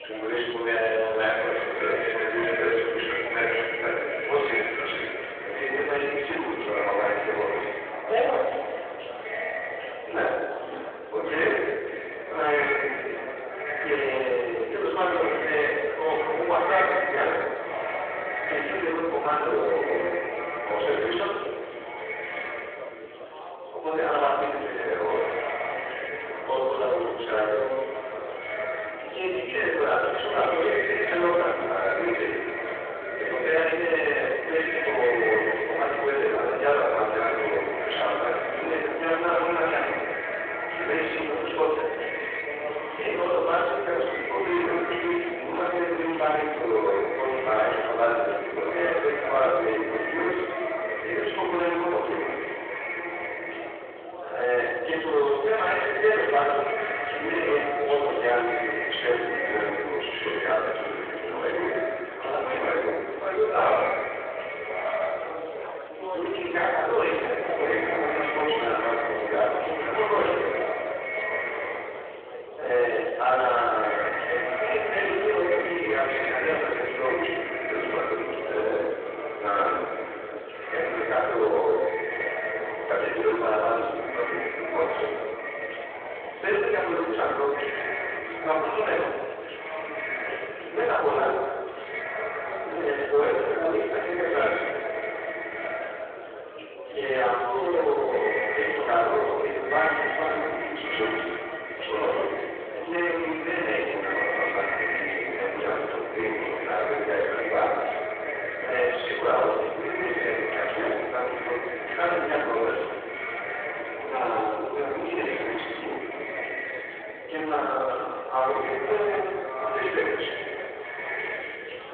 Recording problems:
echo of what is said; strong; throughout; 540 ms later, 6 dB below the speech
room echo; strong; dies away in 1 s
off-mic speech; far
phone-call audio
distortion; slight; 10 dB below the speech
chatter from many people; noticeable; throughout; 15 dB below the speech

